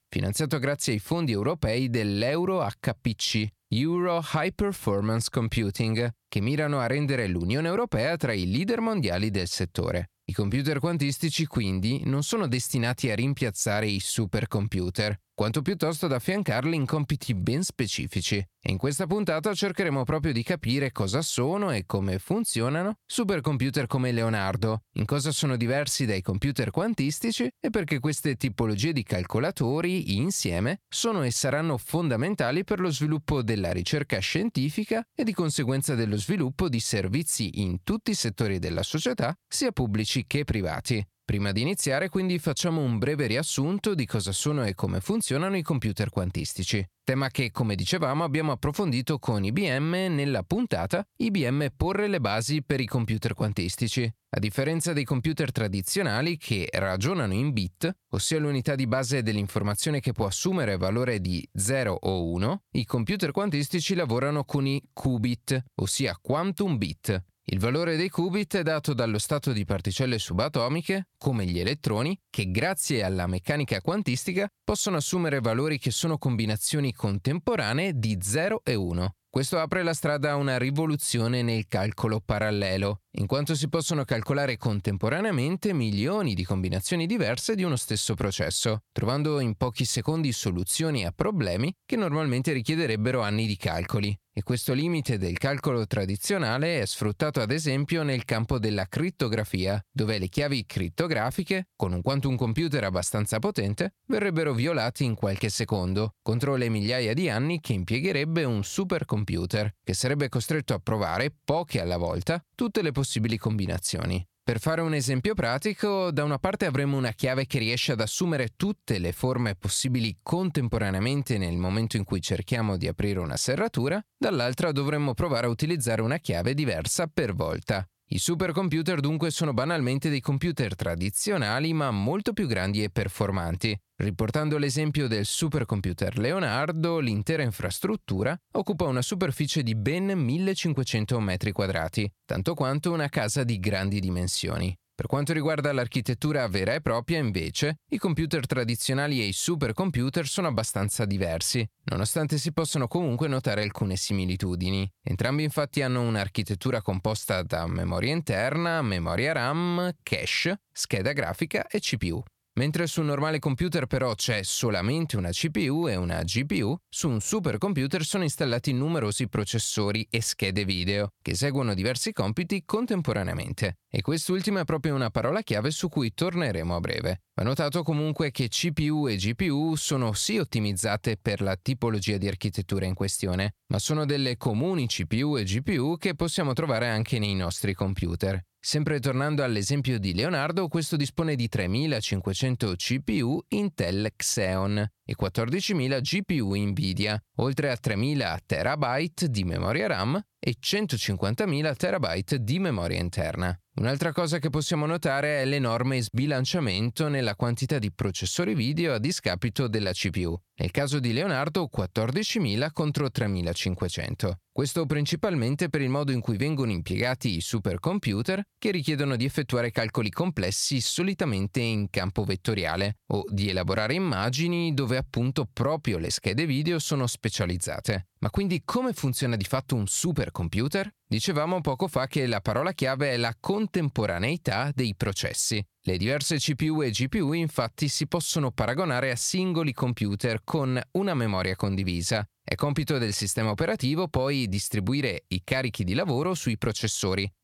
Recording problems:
squashed, flat; somewhat

